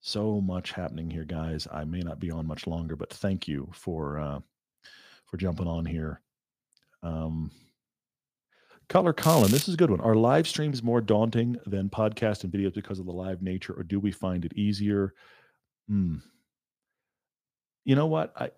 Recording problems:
crackling; loud; at 9 s; 4 dB below the speech

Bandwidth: 15 kHz